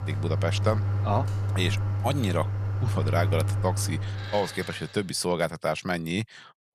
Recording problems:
household noises; very loud; until 4.5 s; 1 dB above the speech

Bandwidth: 14 kHz